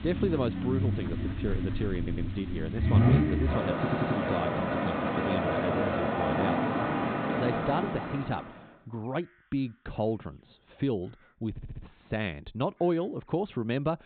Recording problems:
high frequencies cut off; severe; nothing above 4 kHz
traffic noise; very loud; until 8 s; 4 dB above the speech
animal sounds; faint; throughout; 20 dB below the speech
audio stuttering; at 2 s, at 4 s and at 12 s

